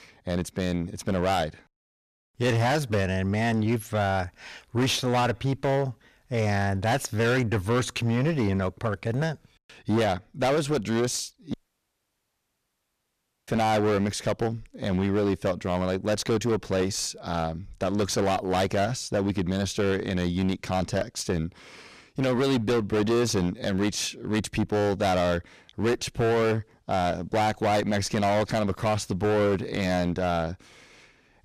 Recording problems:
distortion; heavy; 19% of the sound clipped
audio cutting out; at 12 s for 2 s

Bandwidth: 14.5 kHz